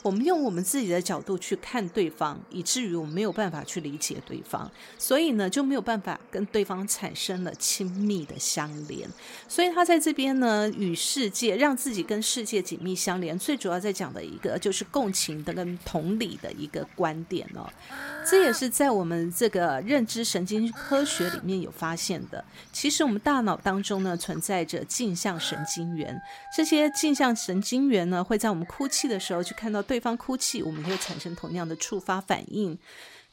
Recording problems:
animal sounds; noticeable; throughout; 15 dB below the speech

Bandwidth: 16 kHz